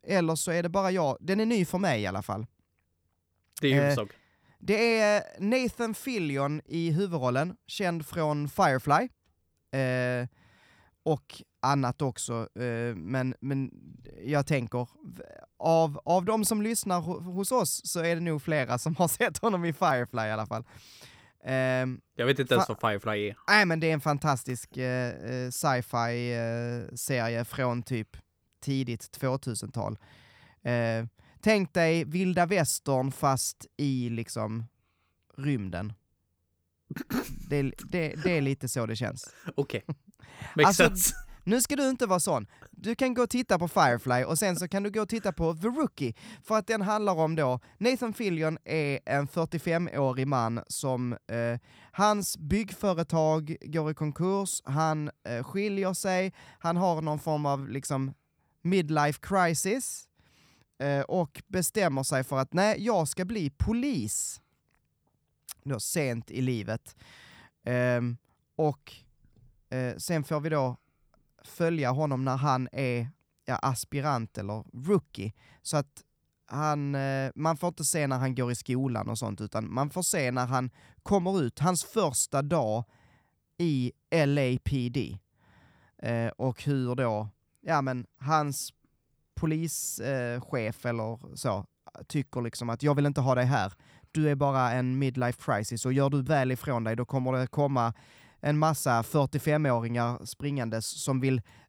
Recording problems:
none

